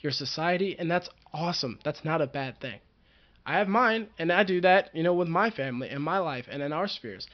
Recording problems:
high frequencies cut off; noticeable; nothing above 5.5 kHz

